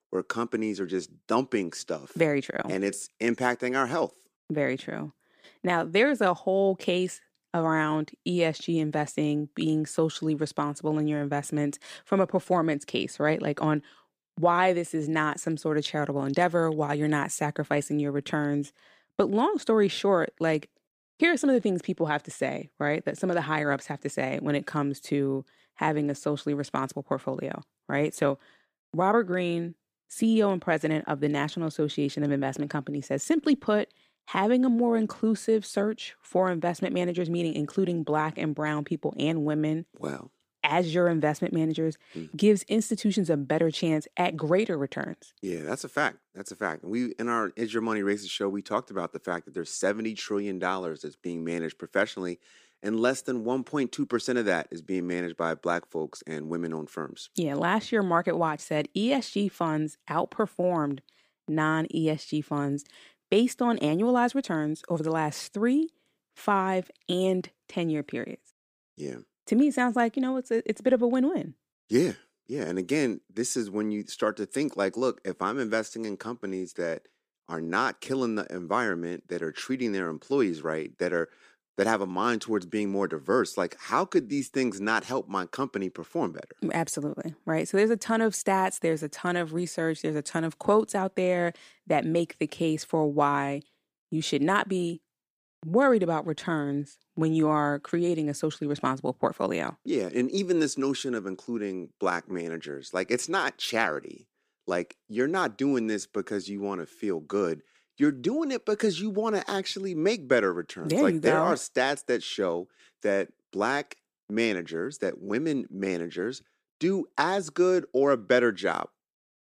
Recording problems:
none

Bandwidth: 15 kHz